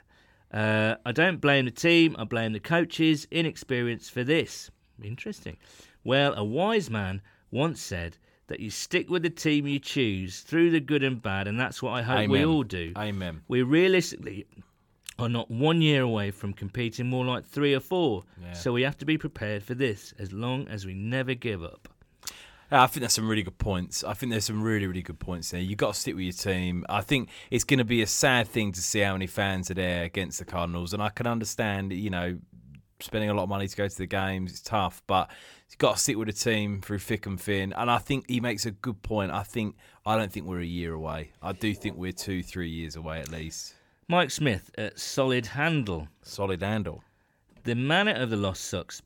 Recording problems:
none

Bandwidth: 17.5 kHz